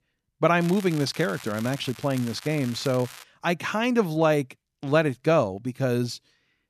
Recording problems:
crackling; noticeable; from 0.5 to 3 s; 15 dB below the speech

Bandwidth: 14 kHz